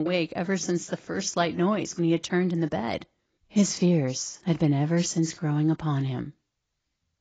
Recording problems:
garbled, watery; badly; nothing above 7.5 kHz
abrupt cut into speech; at the start

